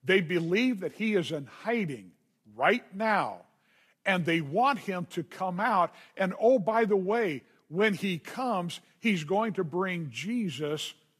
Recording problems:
garbled, watery; slightly; nothing above 14.5 kHz

